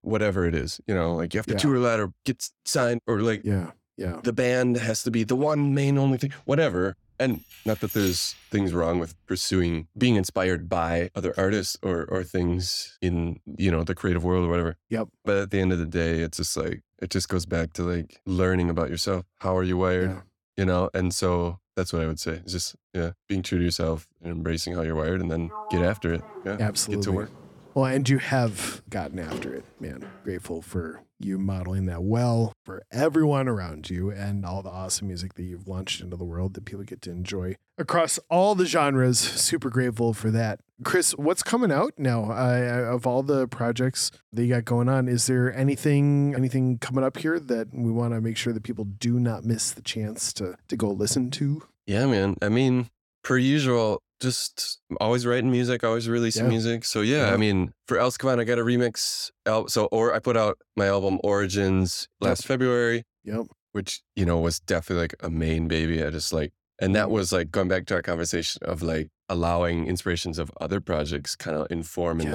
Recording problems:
jangling keys; noticeable; from 7.5 to 8.5 s; peak 8 dB below the speech
door banging; noticeable; from 25 to 30 s; peak 10 dB below the speech
abrupt cut into speech; at the end

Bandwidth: 17 kHz